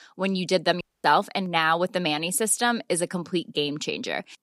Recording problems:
audio cutting out; at 1 s

